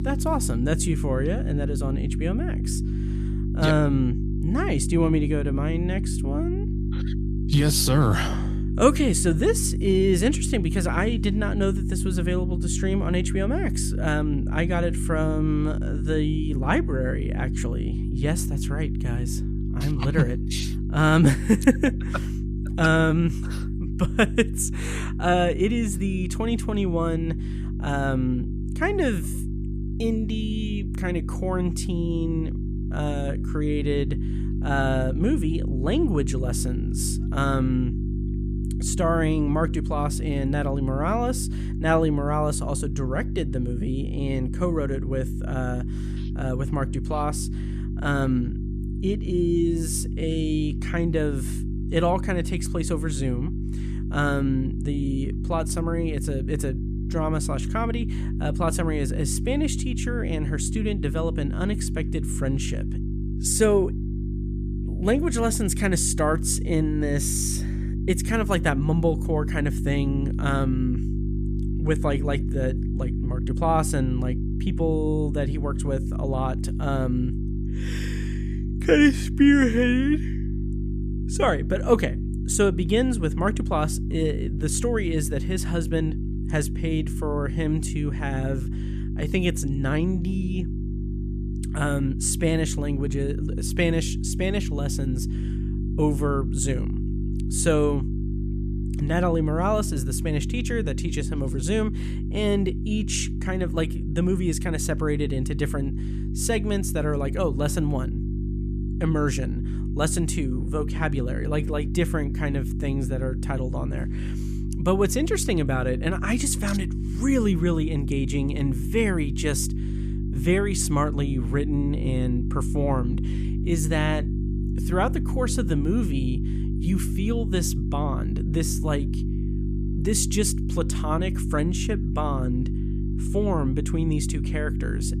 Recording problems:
electrical hum; noticeable; throughout; 50 Hz, 10 dB below the speech

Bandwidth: 14.5 kHz